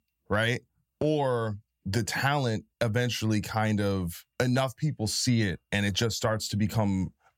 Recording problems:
none

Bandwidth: 16.5 kHz